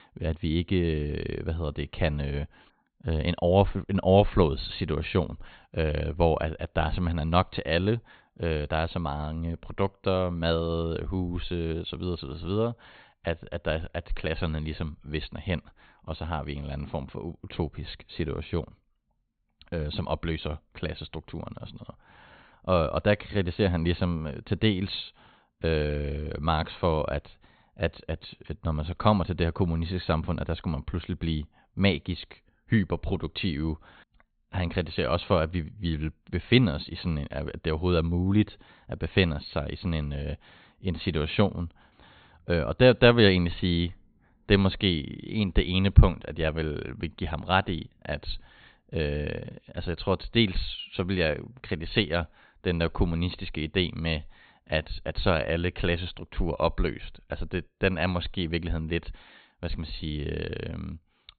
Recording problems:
high frequencies cut off; severe; nothing above 4.5 kHz

